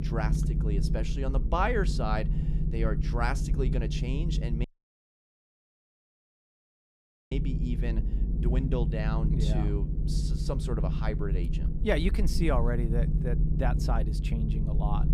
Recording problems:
low rumble; loud; throughout; 8 dB below the speech
audio cutting out; at 4.5 s for 2.5 s

